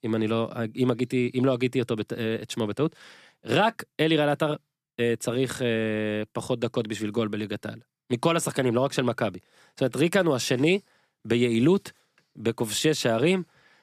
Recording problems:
none

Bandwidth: 14.5 kHz